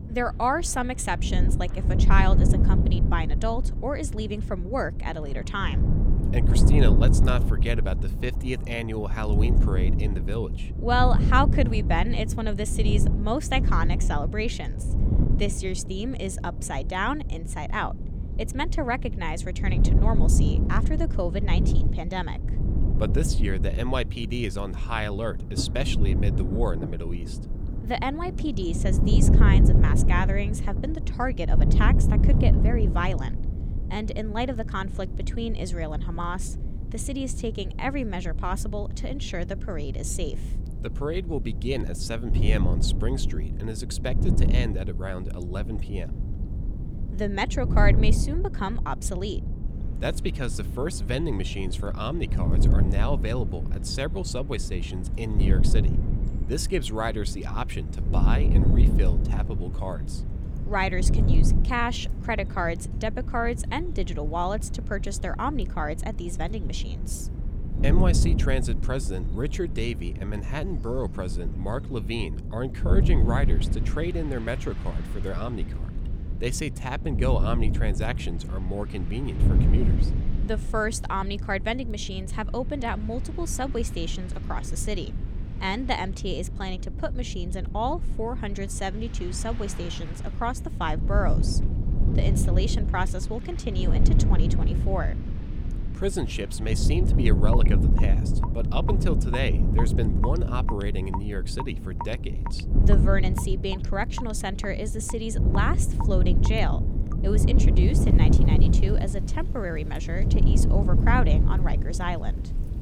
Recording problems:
wind noise on the microphone; heavy; 8 dB below the speech
rain or running water; noticeable; throughout; 15 dB below the speech

